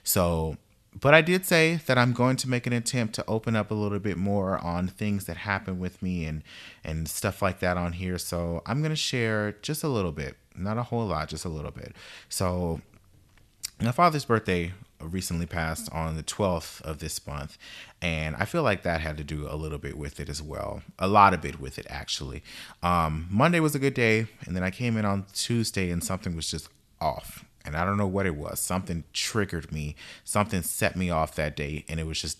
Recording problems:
none

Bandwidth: 13.5 kHz